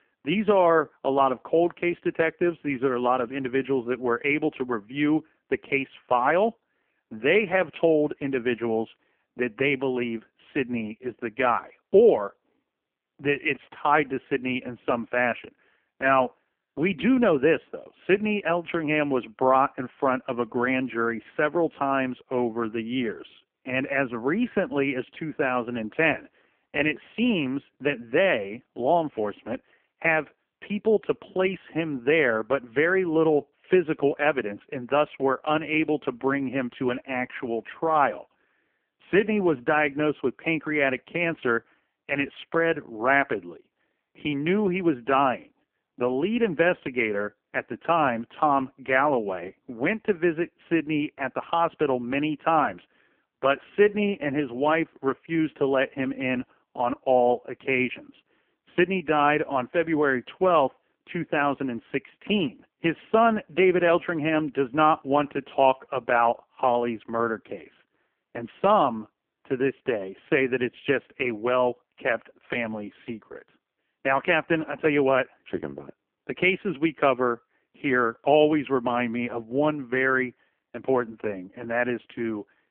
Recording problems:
phone-call audio; poor line; nothing above 3 kHz

